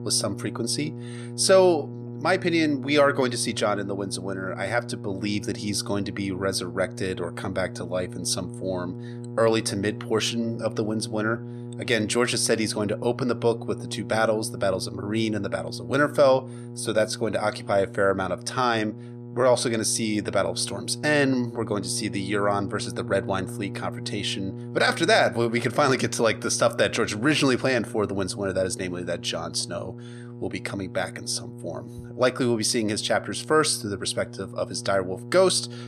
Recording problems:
electrical hum; noticeable; throughout; 60 Hz, 20 dB below the speech

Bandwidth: 14.5 kHz